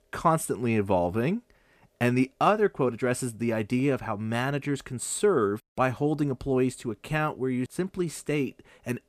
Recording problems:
none

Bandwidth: 14.5 kHz